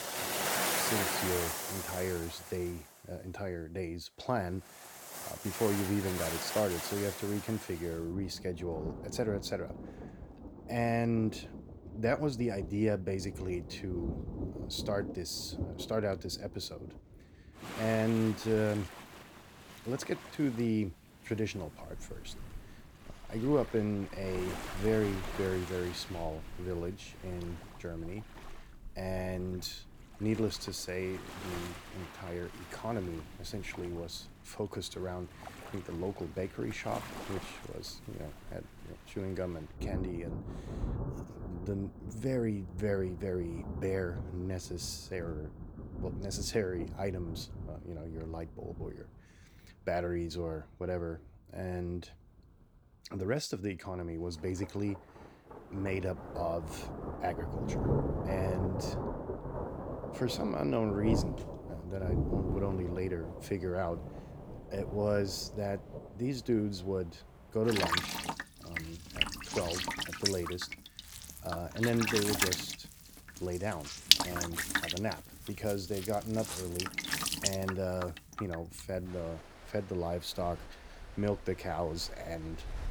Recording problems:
rain or running water; loud; throughout; 2 dB below the speech

